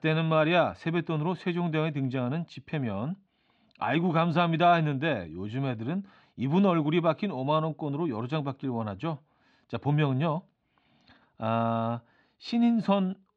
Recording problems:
muffled; very slightly; fading above 4 kHz

